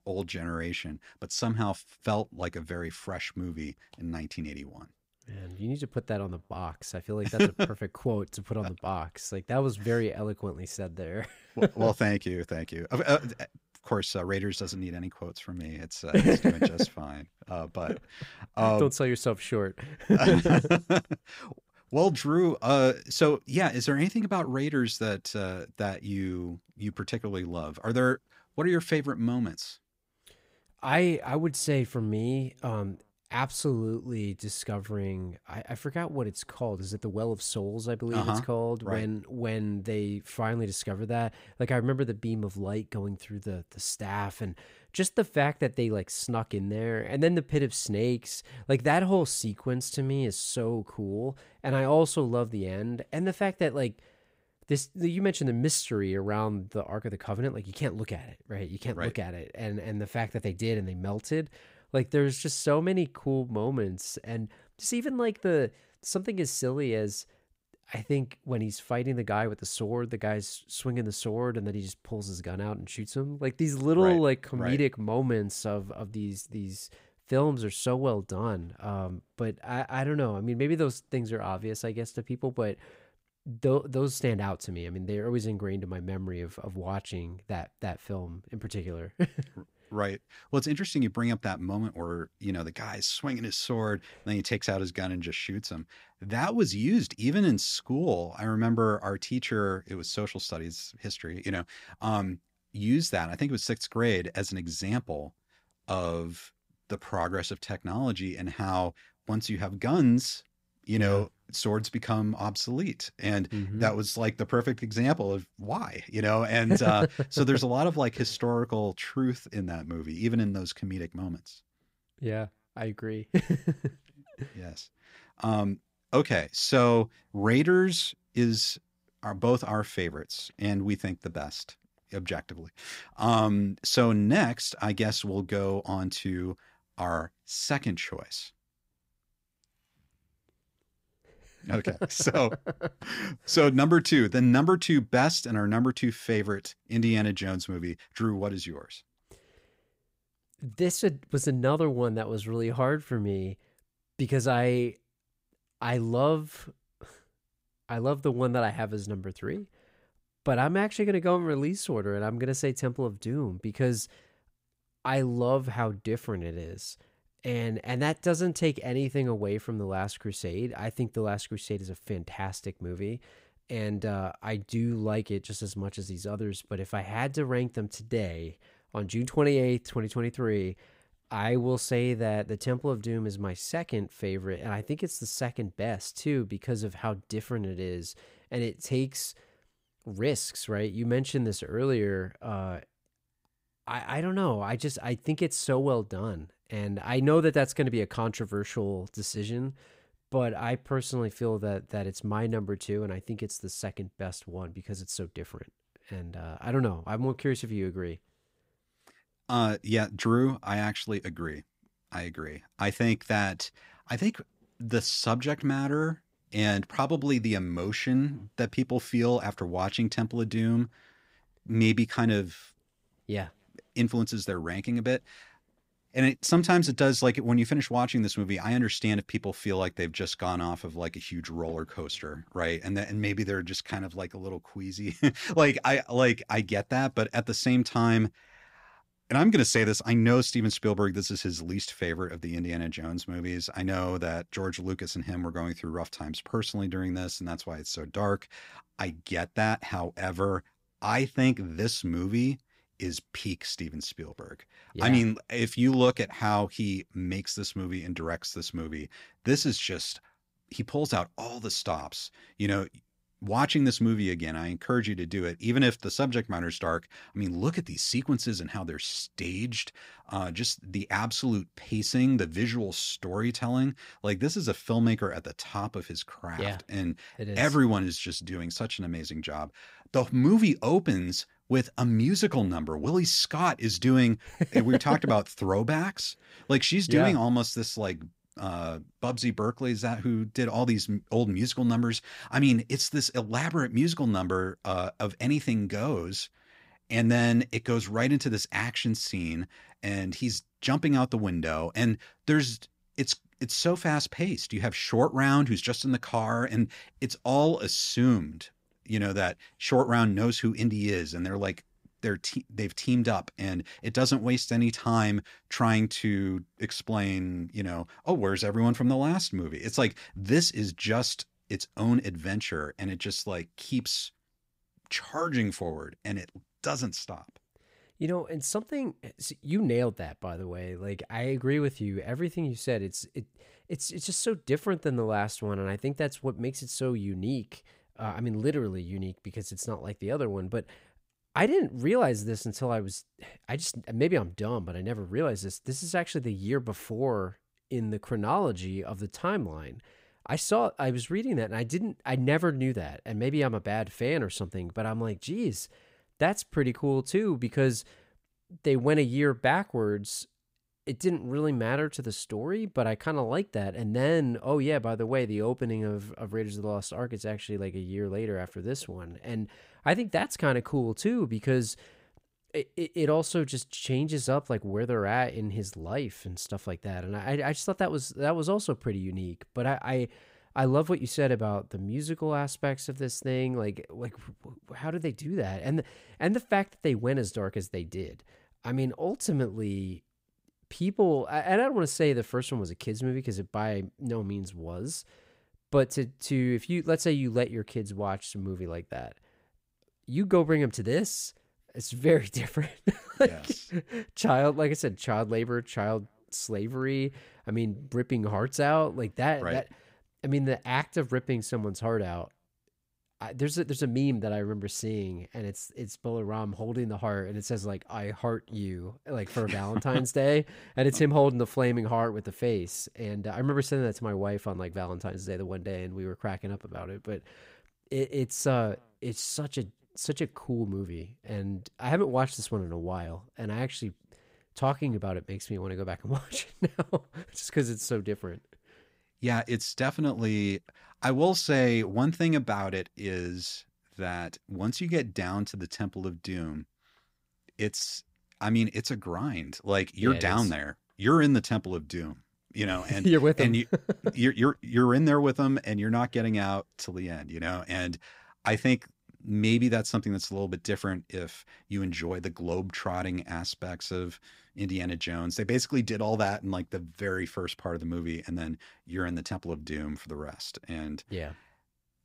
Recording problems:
none

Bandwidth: 15.5 kHz